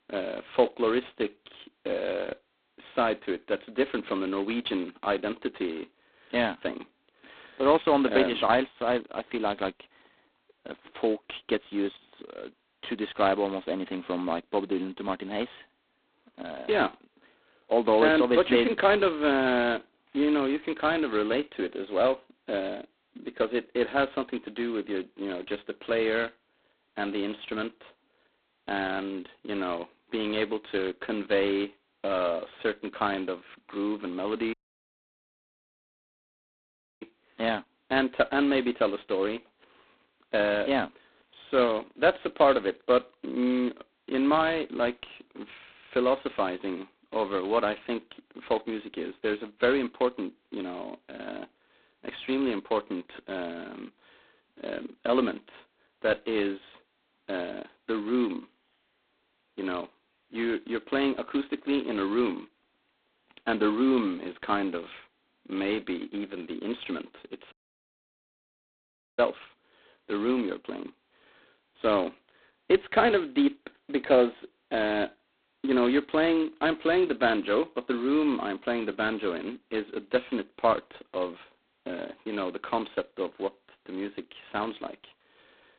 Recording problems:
phone-call audio; poor line; nothing above 4 kHz
audio cutting out; at 35 s for 2.5 s and at 1:08 for 1.5 s

